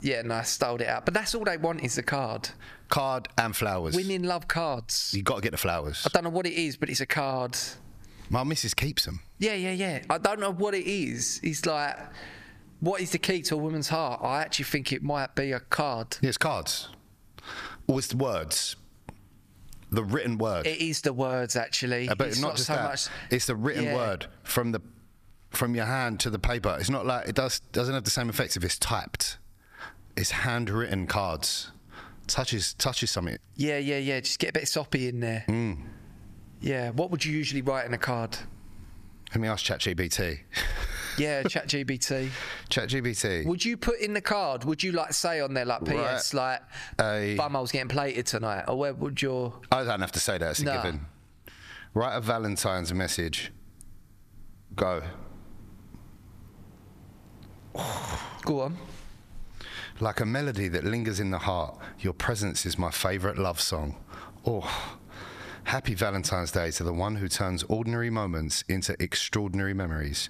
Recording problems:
squashed, flat; heavily

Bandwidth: 14.5 kHz